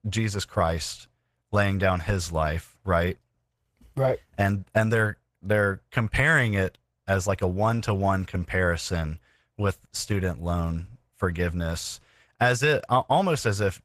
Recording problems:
garbled, watery; slightly; nothing above 14.5 kHz

